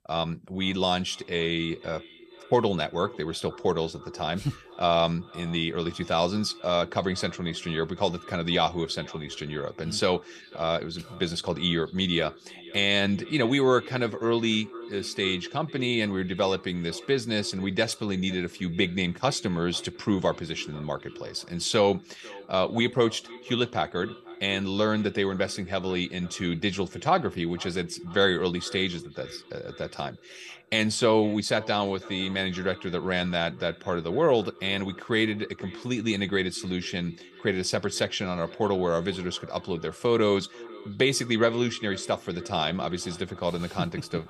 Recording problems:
echo of what is said; faint; throughout; 490 ms later, 20 dB below the speech

